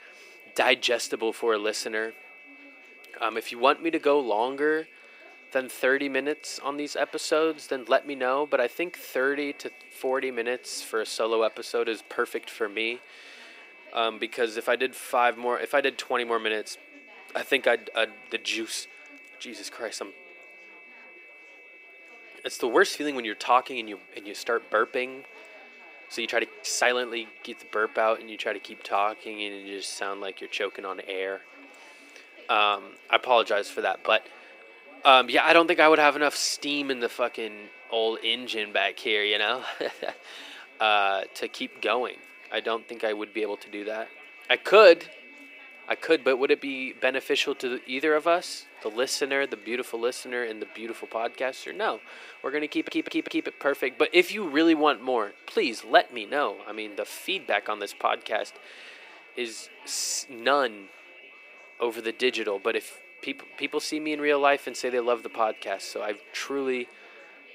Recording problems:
thin; somewhat; fading below 350 Hz
high-pitched whine; faint; throughout; 2.5 kHz, 20 dB below the speech
murmuring crowd; faint; throughout; 25 dB below the speech
uneven, jittery; strongly; from 26 to 47 s
audio stuttering; at 53 s

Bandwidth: 15.5 kHz